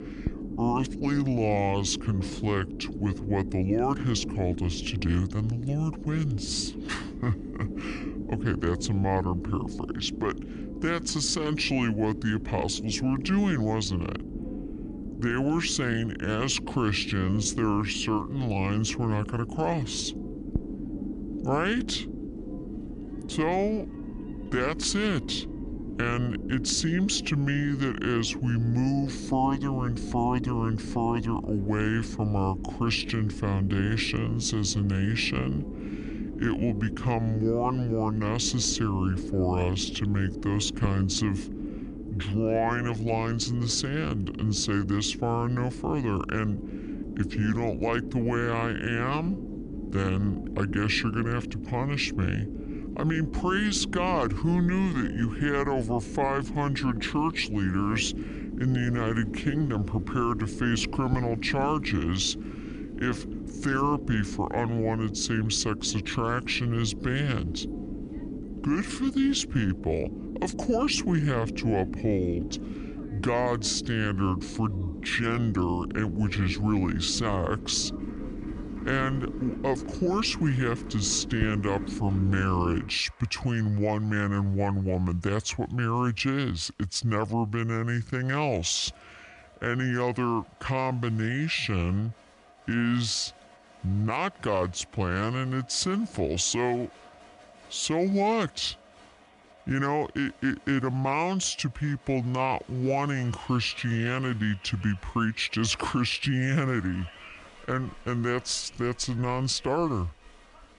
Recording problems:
wrong speed and pitch; too slow and too low; 0.7 times normal speed
low rumble; noticeable; until 1:23; 10 dB below the speech
crowd noise; faint; throughout; 25 dB below the speech

